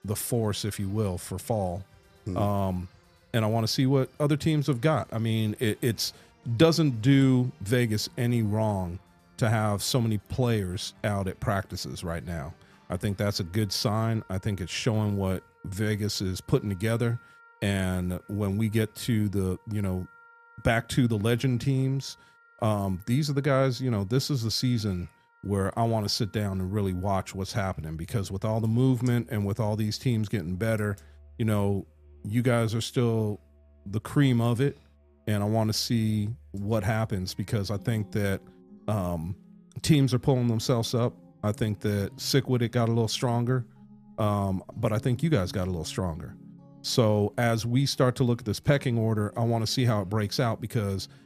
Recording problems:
background music; faint; throughout; 25 dB below the speech

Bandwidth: 14.5 kHz